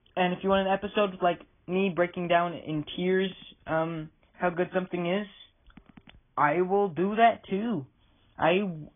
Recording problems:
garbled, watery; badly
high frequencies cut off; severe; nothing above 3.5 kHz

